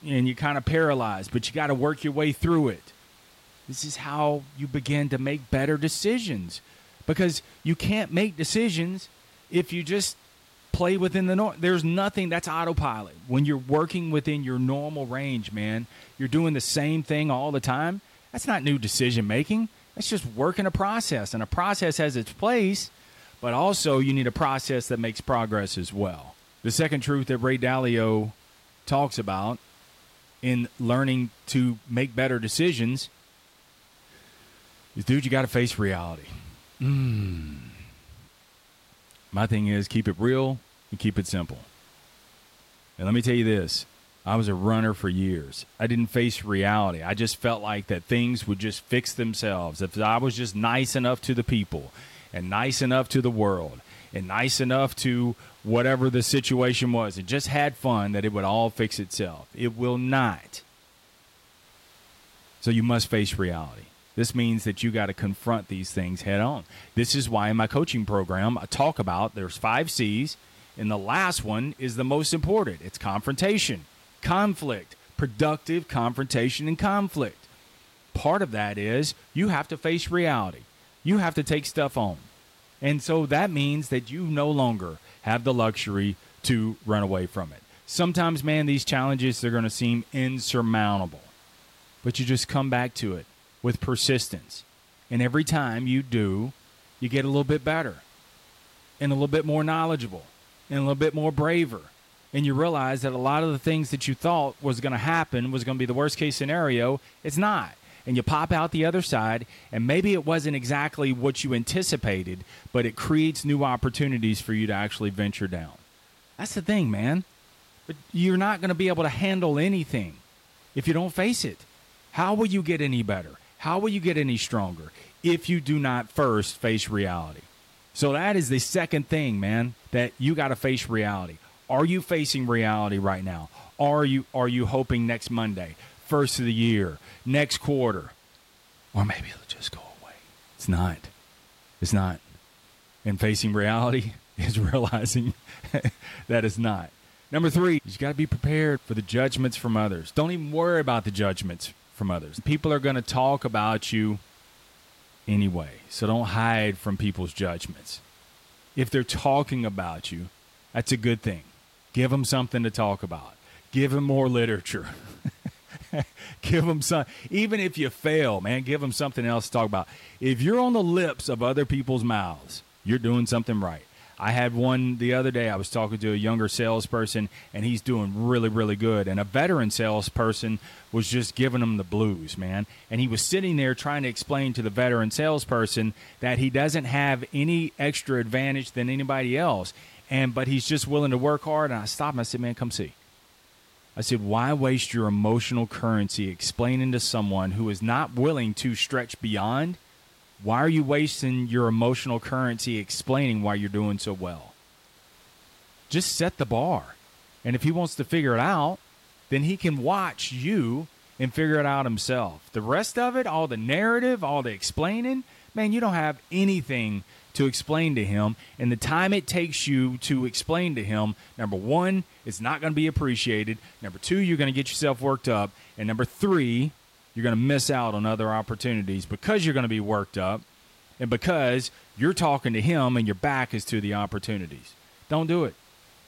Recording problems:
hiss; faint; throughout; 30 dB below the speech

